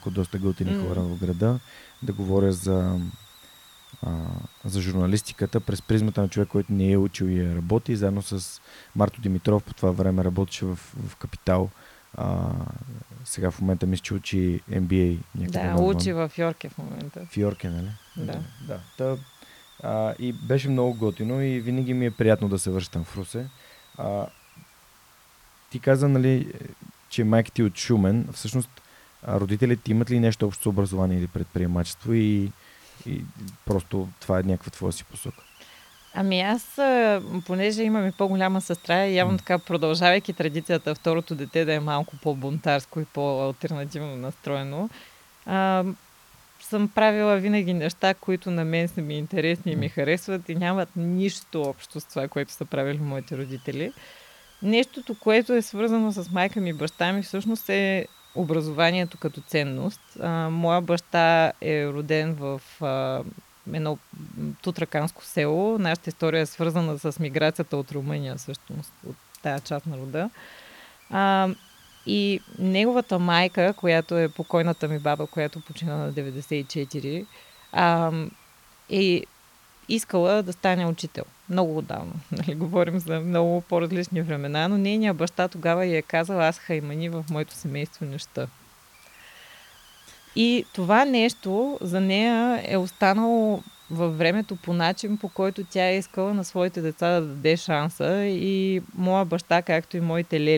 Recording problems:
hiss; faint; throughout; 25 dB below the speech
abrupt cut into speech; at the end

